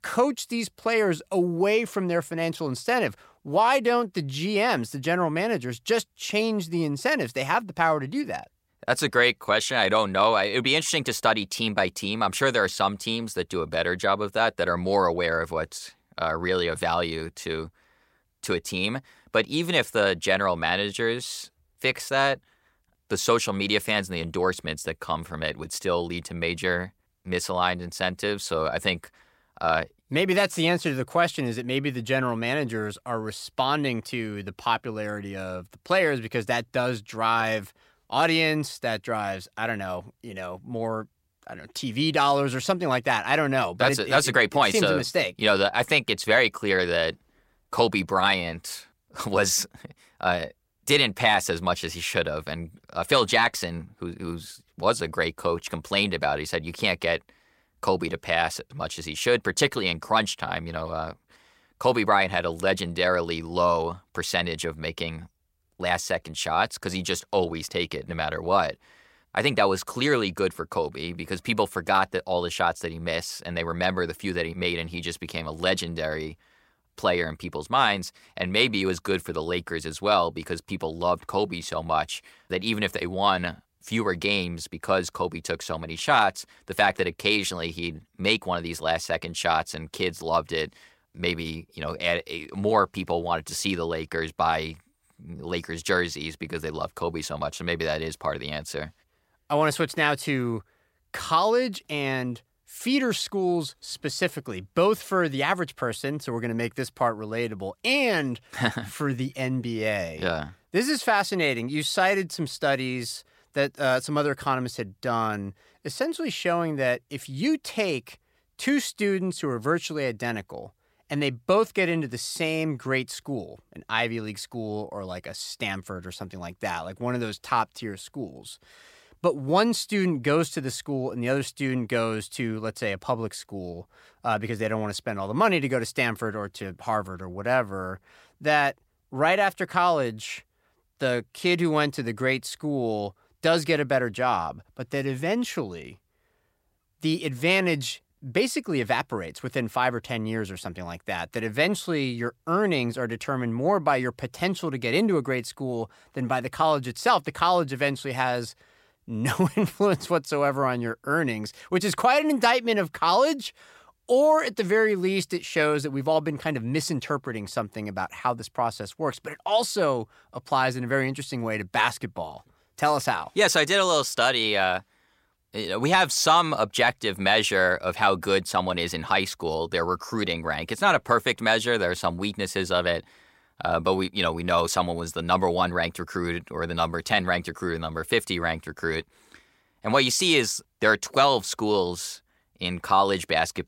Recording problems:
none

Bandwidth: 16 kHz